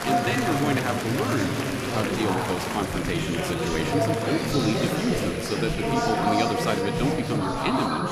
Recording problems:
chatter from many people; very loud; throughout; 2 dB above the speech
high-pitched whine; noticeable; throughout; 10.5 kHz, 20 dB below the speech

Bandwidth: 14.5 kHz